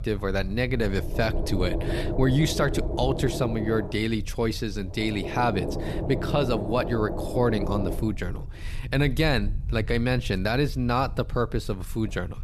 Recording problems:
low rumble; loud; throughout; 7 dB below the speech

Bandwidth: 13.5 kHz